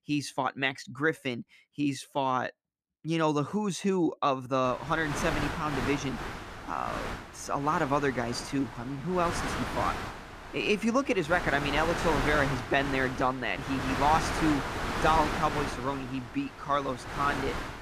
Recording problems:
wind noise on the microphone; heavy; from 4.5 s on; 5 dB below the speech

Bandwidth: 14.5 kHz